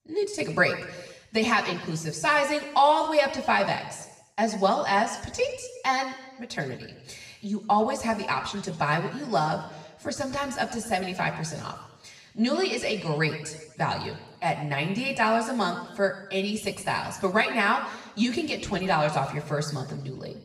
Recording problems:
room echo; slight; dies away in 1 s
off-mic speech; somewhat distant

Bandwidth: 14.5 kHz